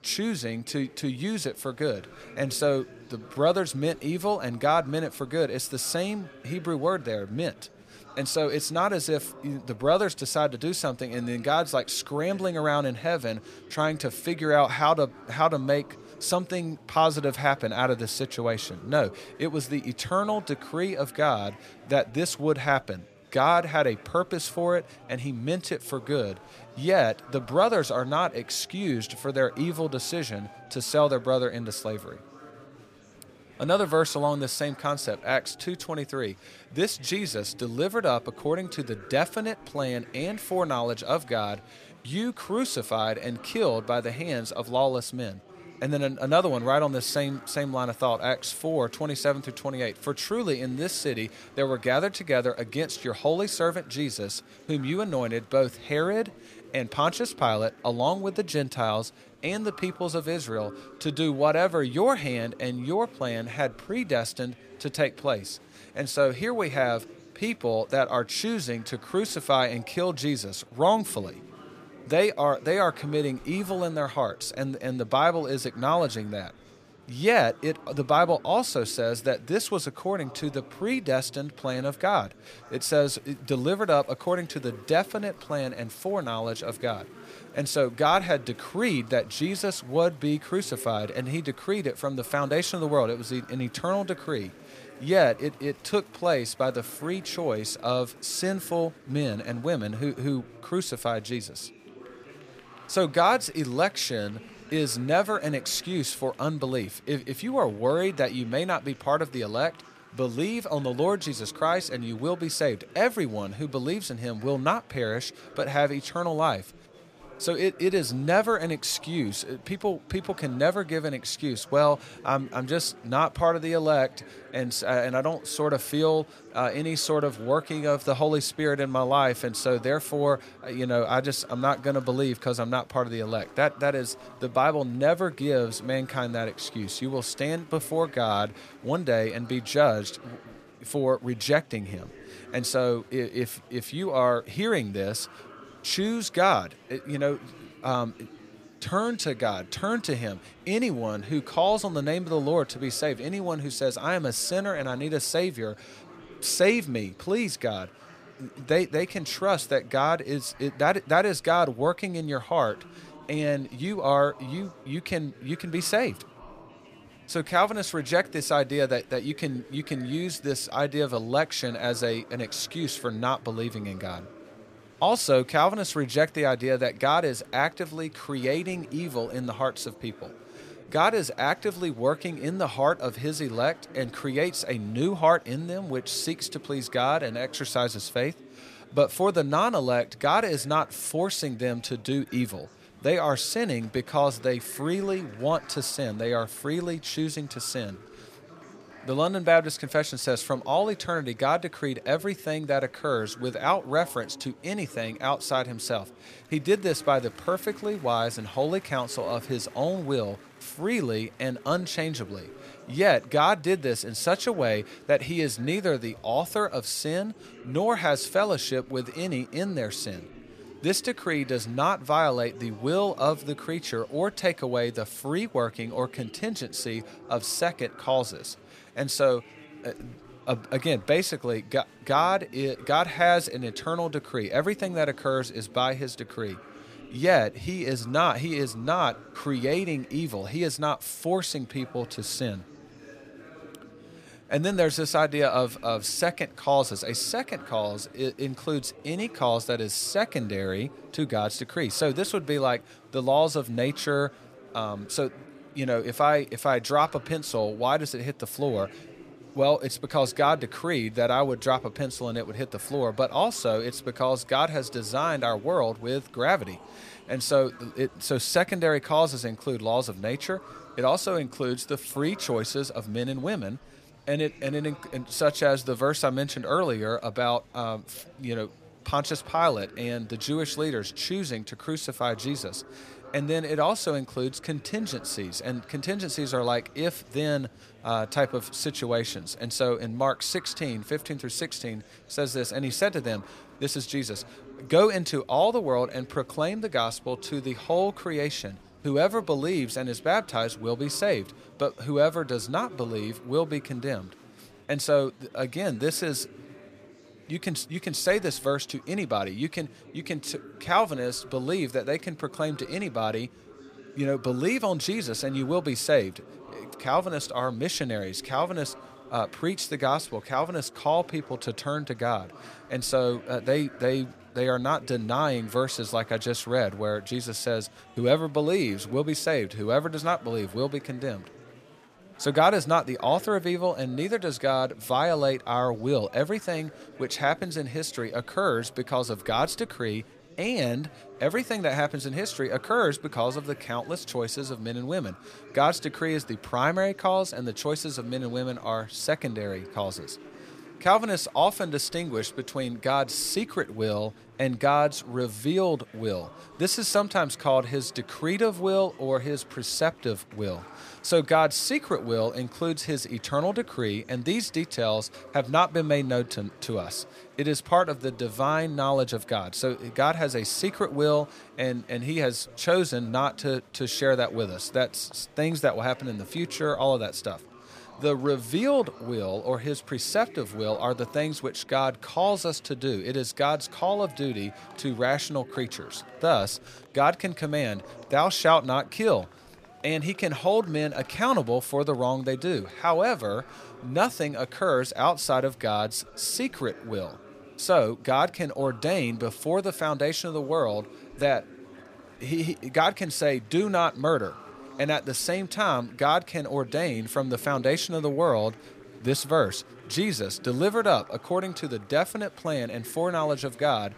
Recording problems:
murmuring crowd; faint; throughout; 20 dB below the speech

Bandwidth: 15 kHz